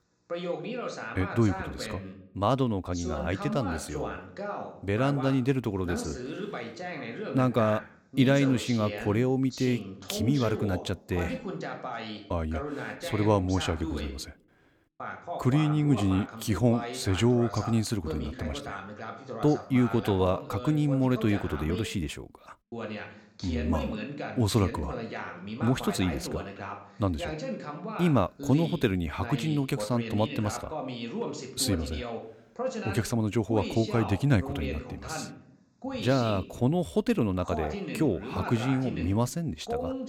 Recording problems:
voice in the background; loud; throughout; 9 dB below the speech

